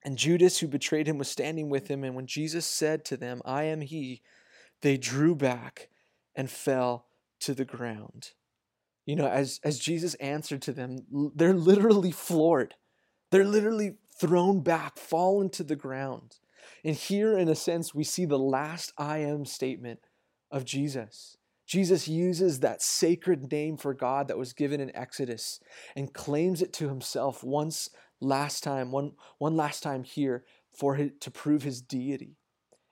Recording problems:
none

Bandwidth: 16.5 kHz